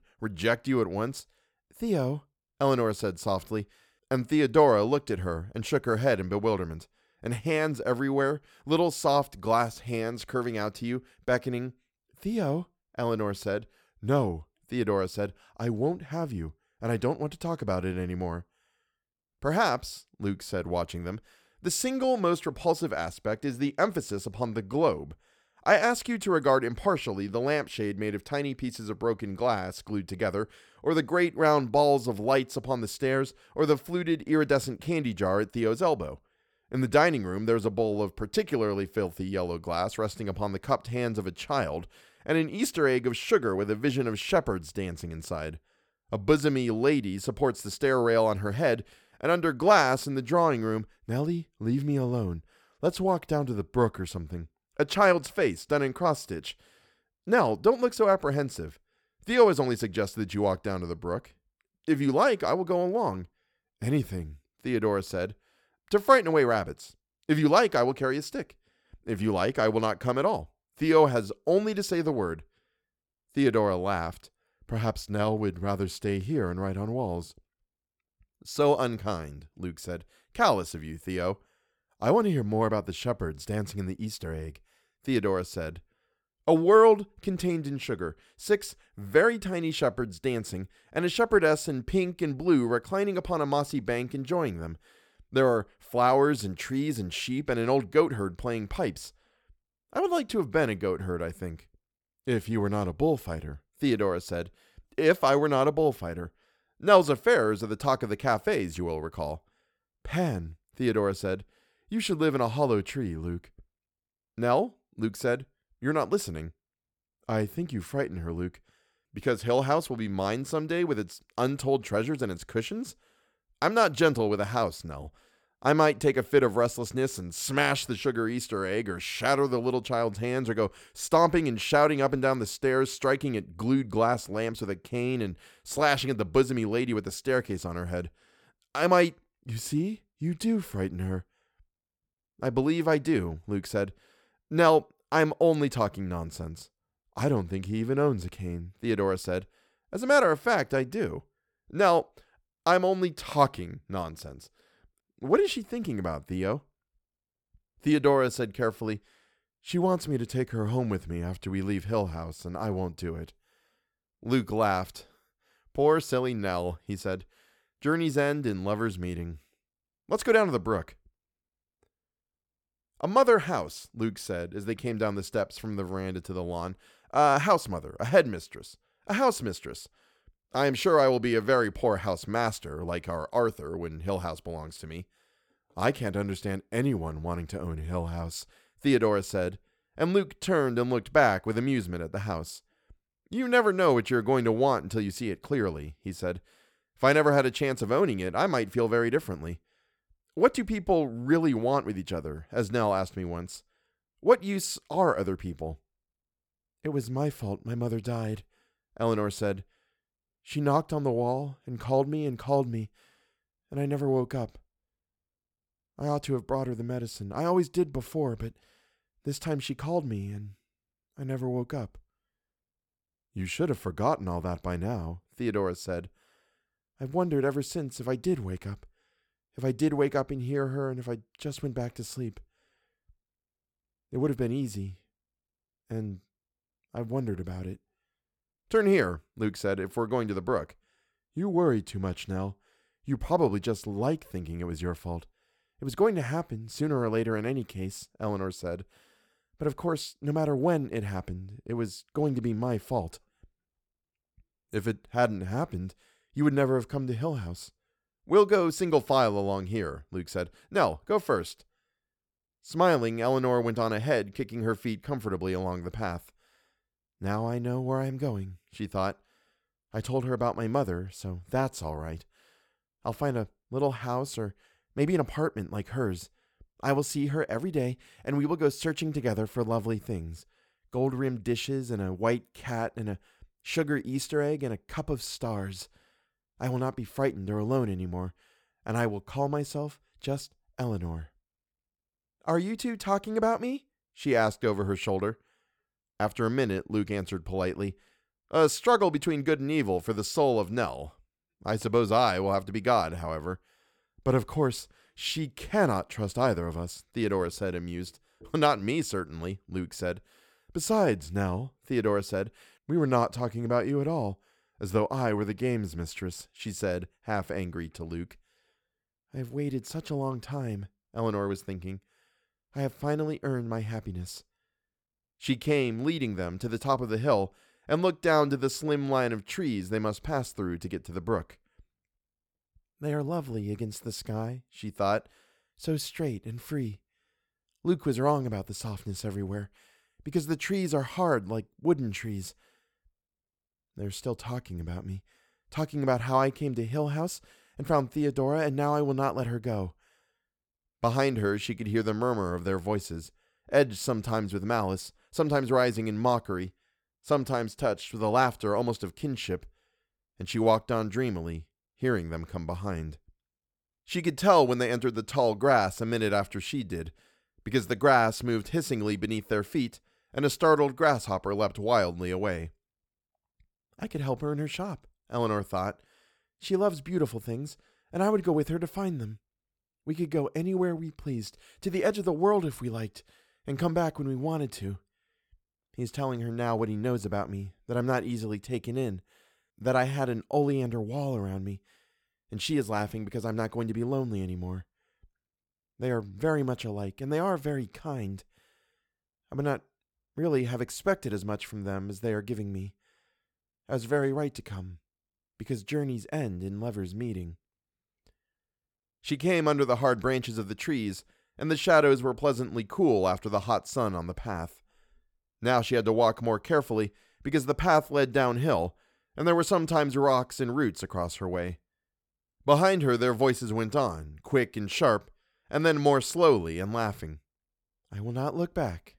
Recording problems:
none

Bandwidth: 18.5 kHz